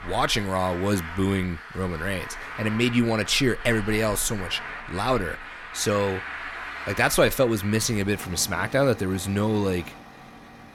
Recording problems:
traffic noise; noticeable; throughout; 10 dB below the speech

